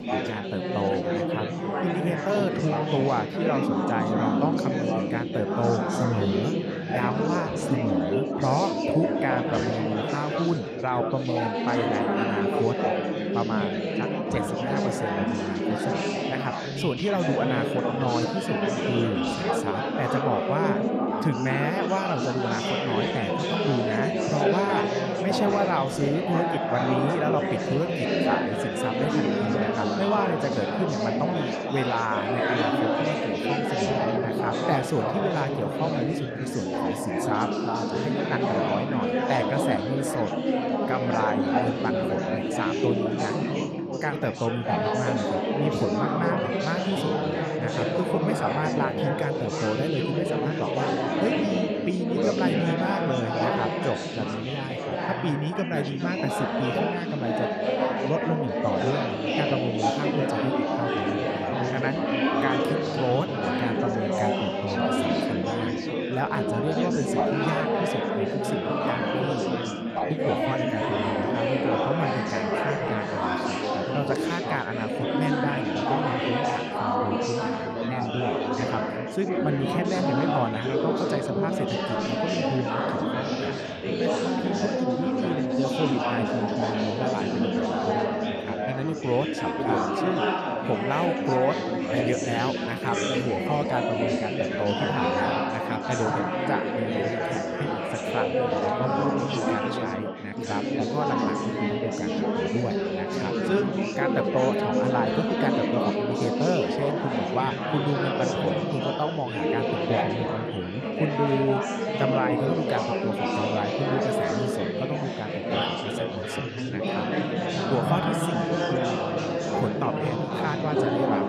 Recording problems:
chatter from many people; very loud; throughout; 4 dB above the speech

